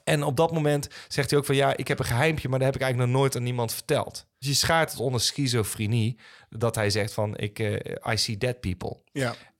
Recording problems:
none

